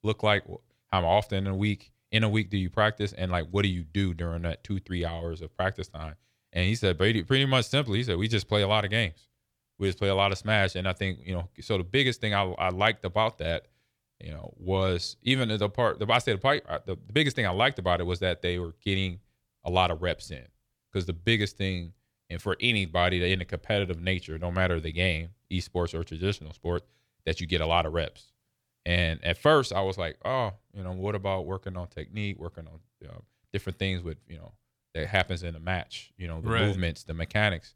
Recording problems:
none

